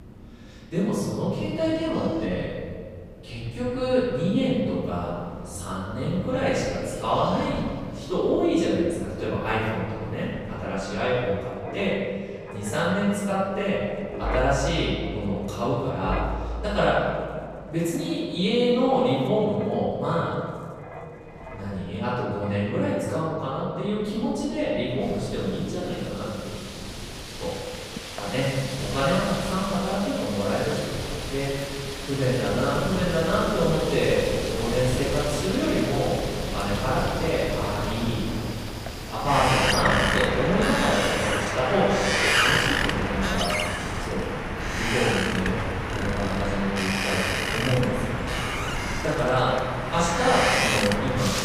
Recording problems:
room echo; strong; dies away in 2.1 s
off-mic speech; far
wind in the background; loud; throughout; 3 dB below the speech

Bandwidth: 15 kHz